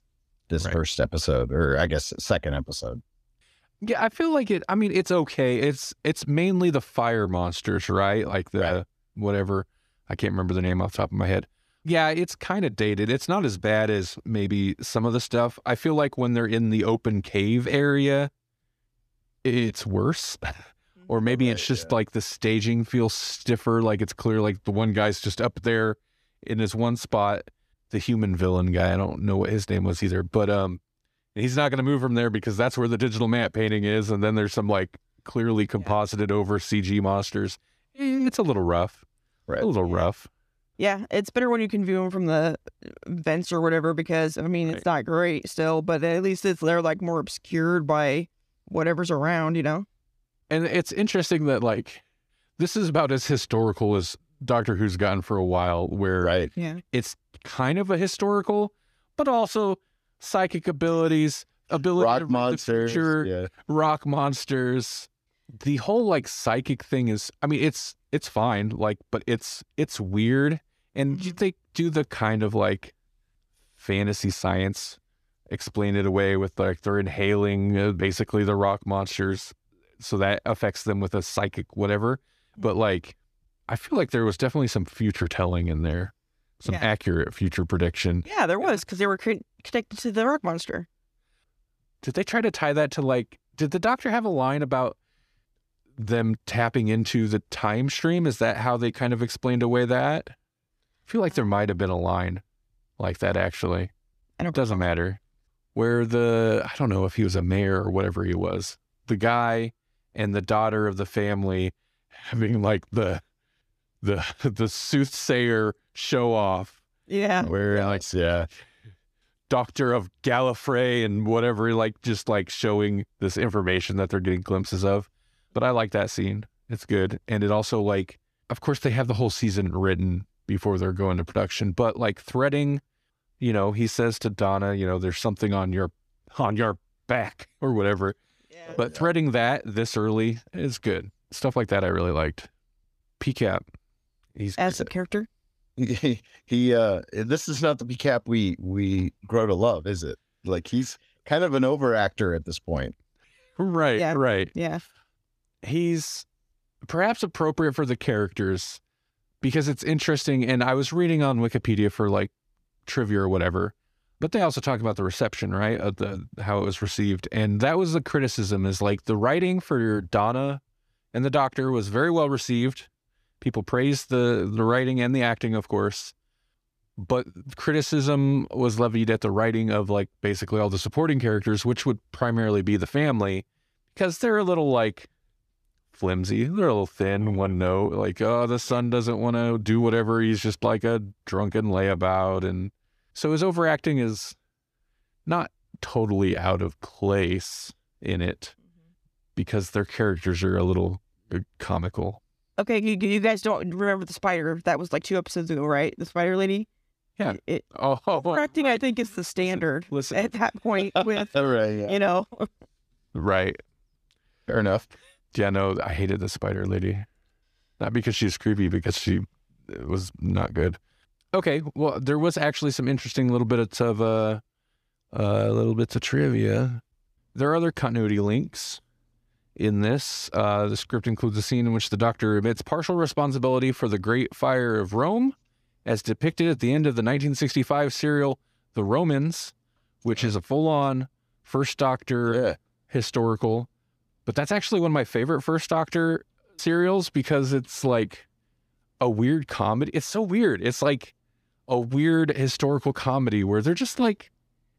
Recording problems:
none

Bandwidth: 14.5 kHz